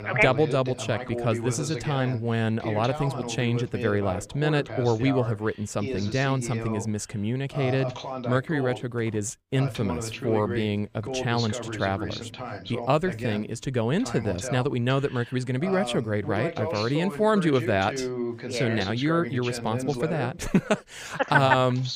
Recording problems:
voice in the background; loud; throughout; 8 dB below the speech

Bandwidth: 15.5 kHz